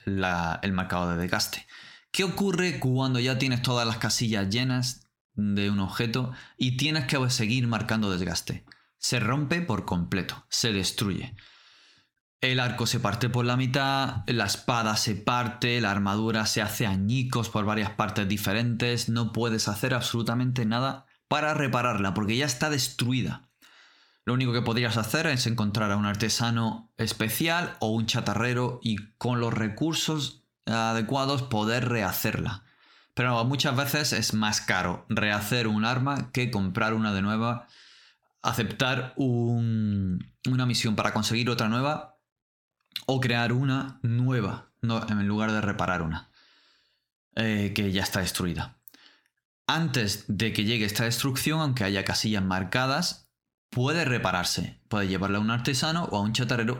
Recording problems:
squashed, flat; heavily

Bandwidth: 17 kHz